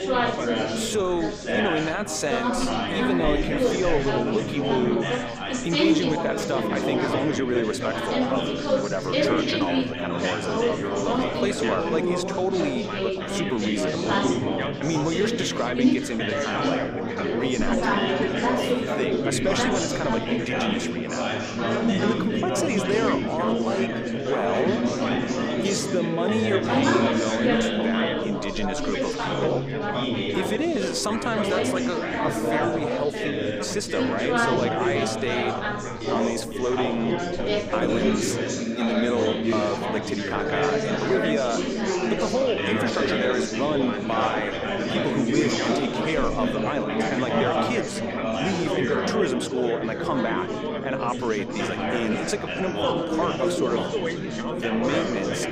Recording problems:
chatter from many people; very loud; throughout; 3 dB above the speech

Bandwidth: 15.5 kHz